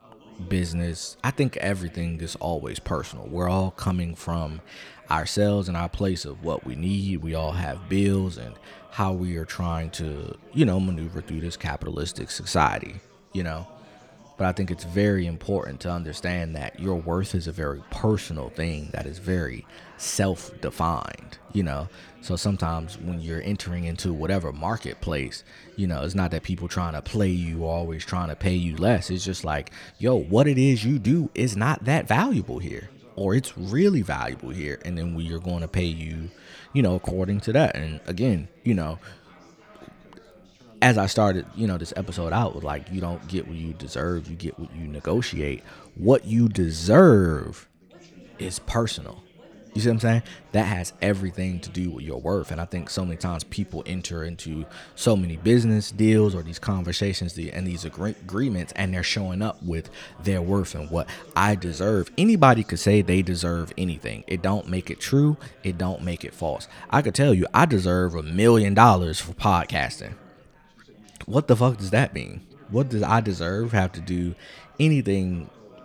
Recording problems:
background chatter; faint; throughout; 4 voices, 25 dB below the speech

